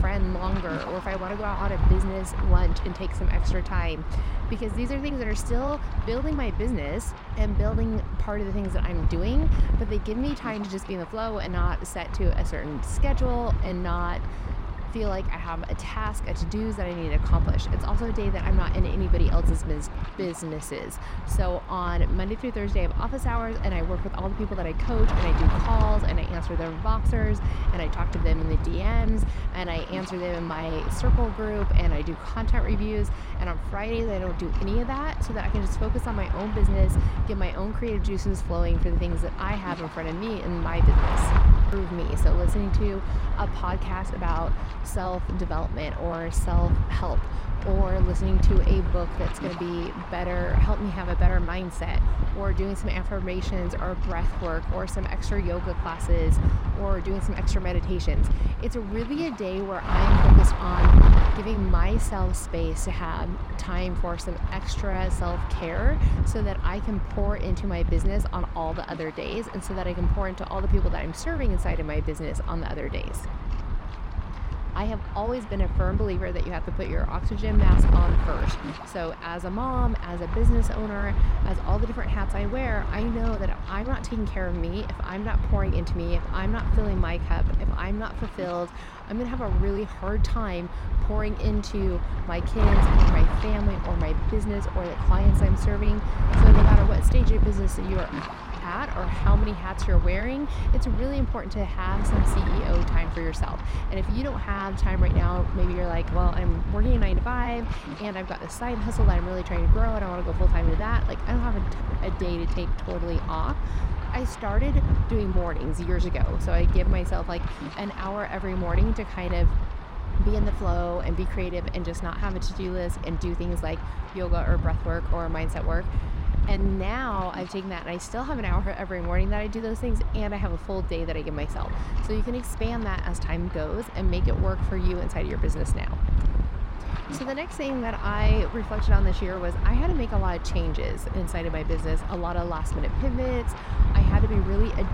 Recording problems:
wind noise on the microphone; heavy; 5 dB below the speech

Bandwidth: 16 kHz